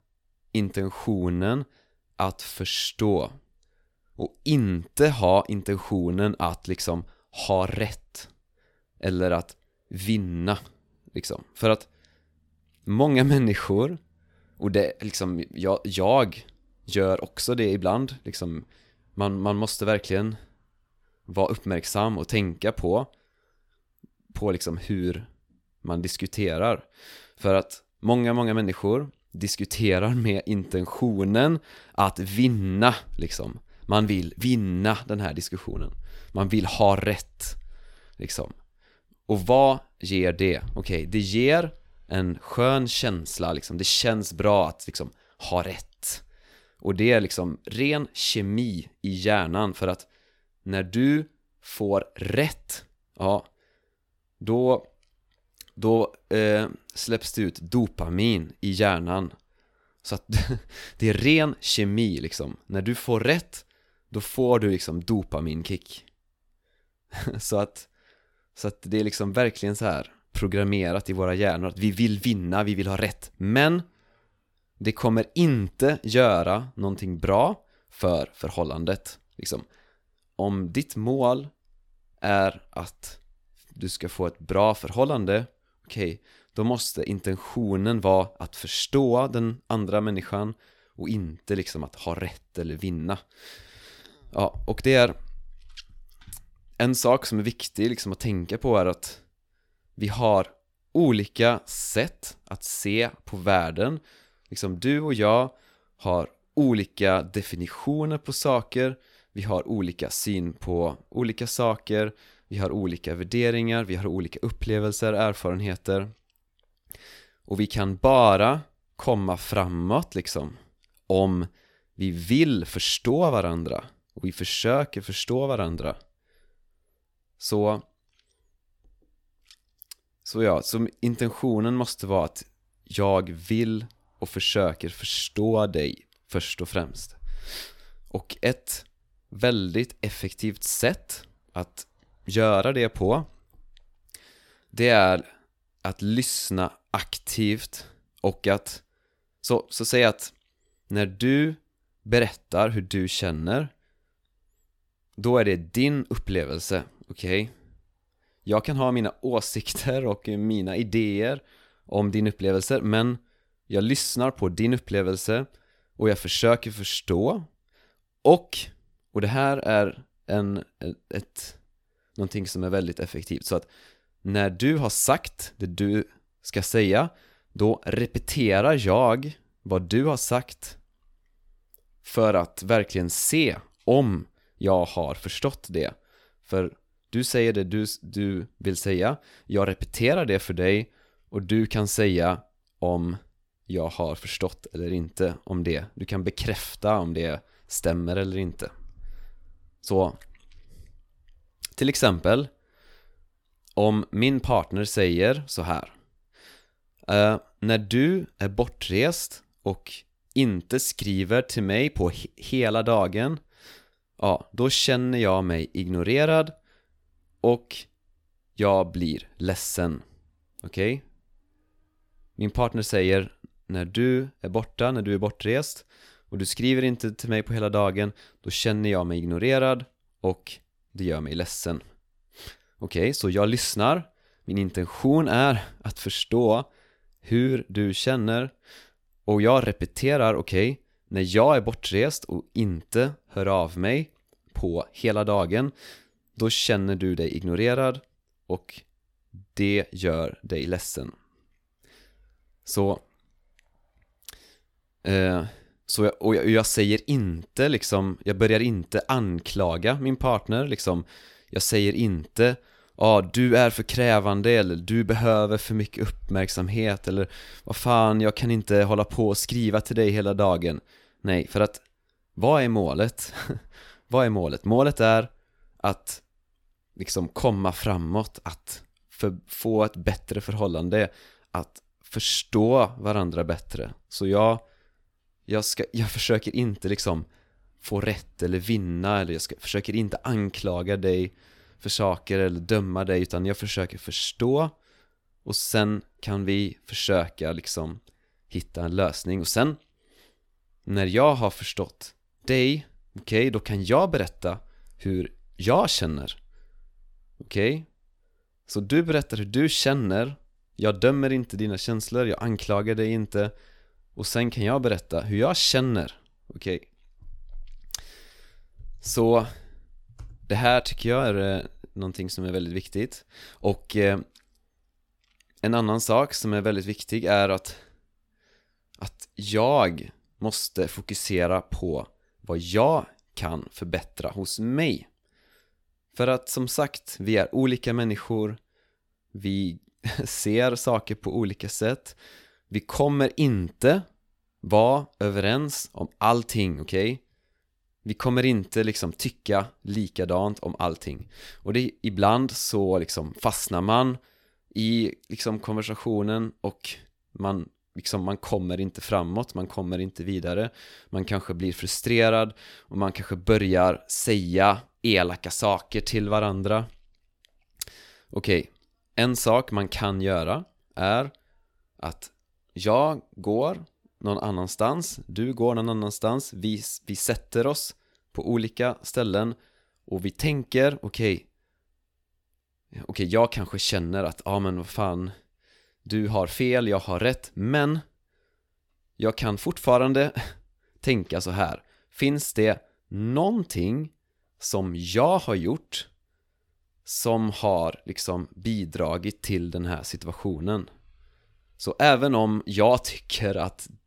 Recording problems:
none

